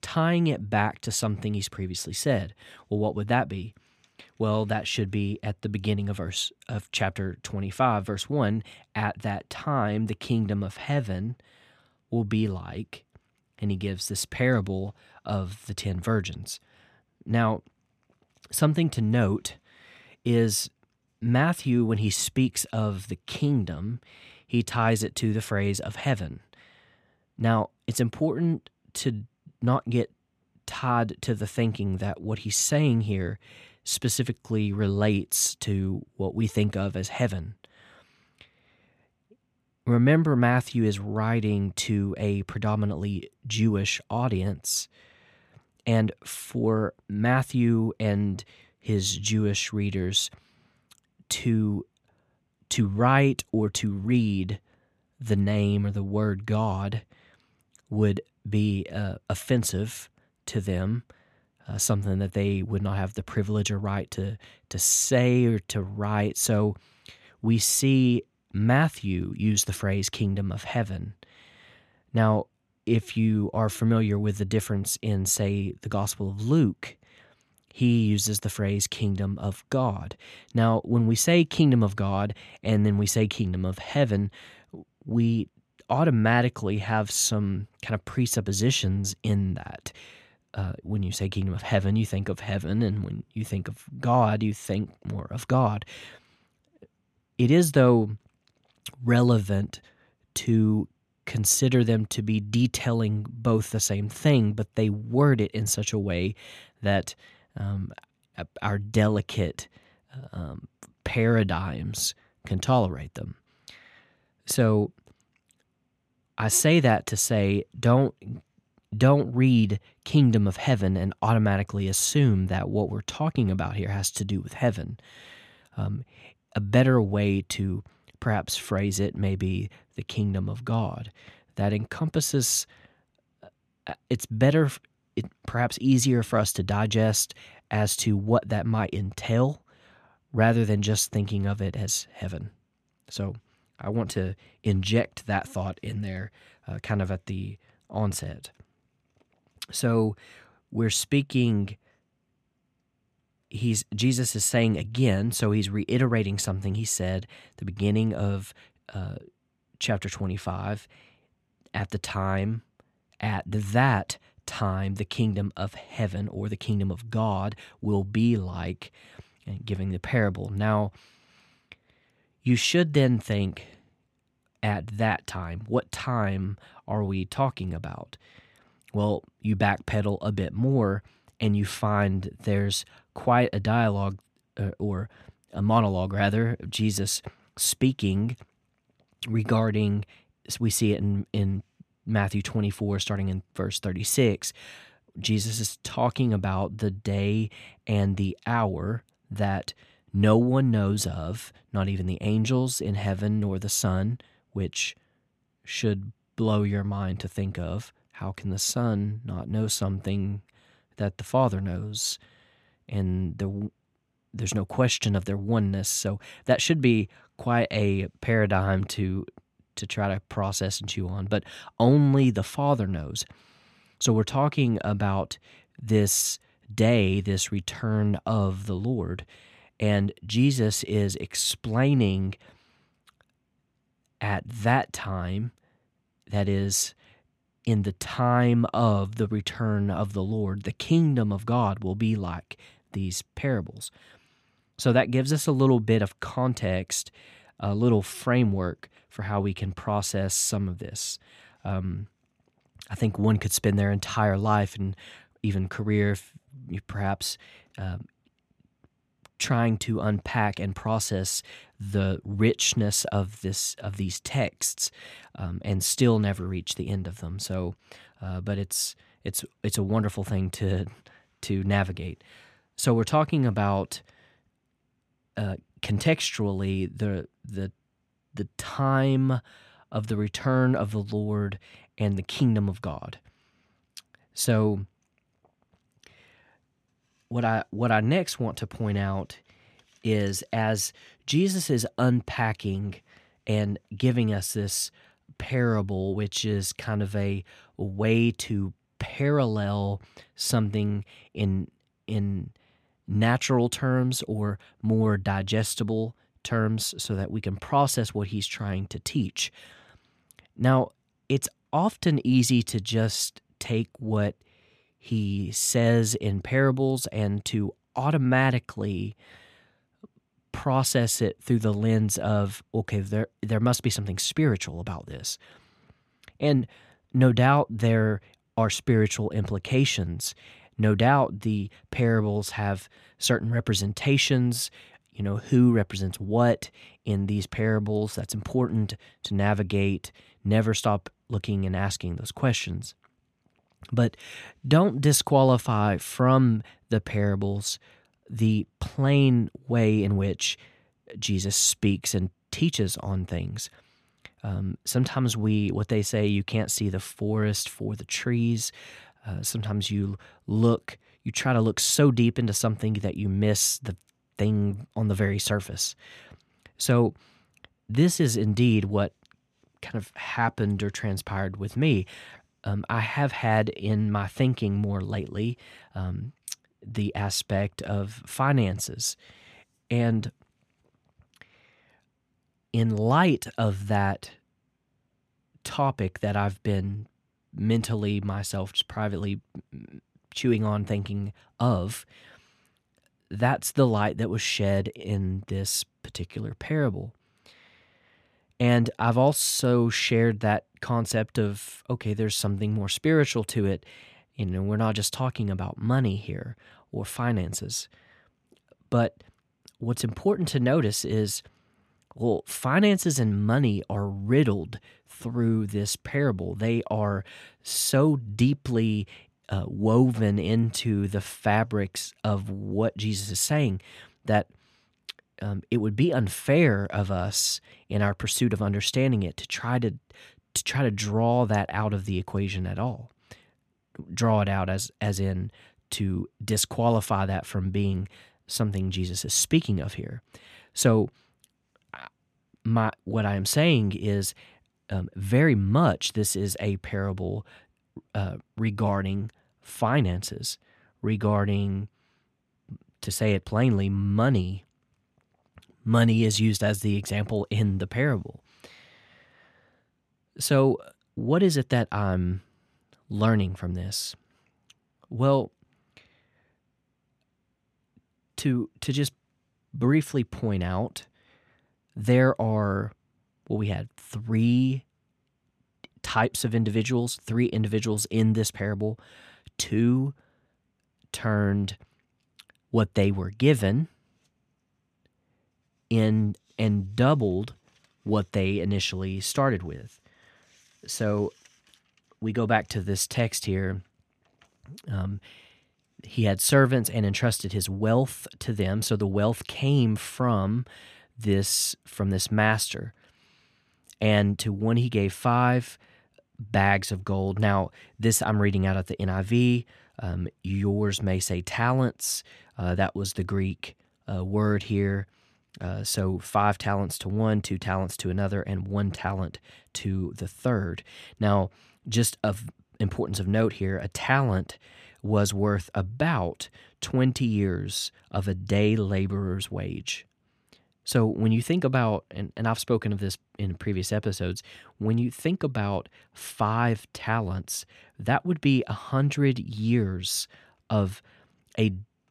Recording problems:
none

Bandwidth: 14 kHz